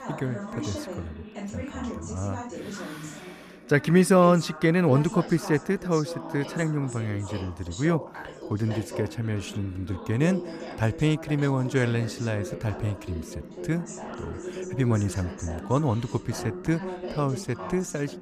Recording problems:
background chatter; noticeable; throughout; 3 voices, 10 dB below the speech

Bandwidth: 14.5 kHz